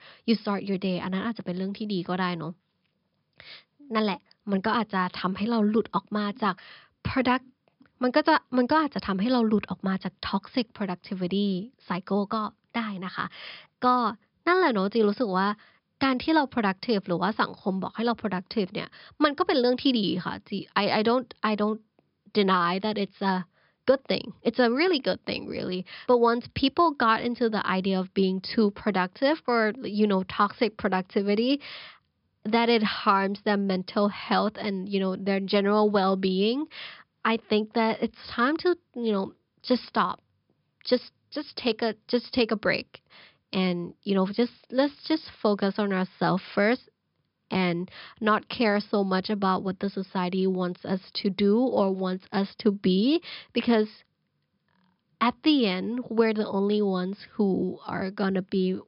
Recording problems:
high frequencies cut off; noticeable; nothing above 5.5 kHz

